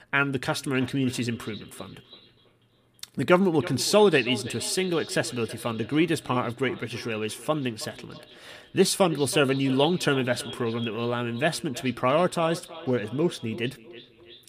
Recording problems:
echo of what is said; noticeable; throughout; 330 ms later, 15 dB below the speech

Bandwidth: 15 kHz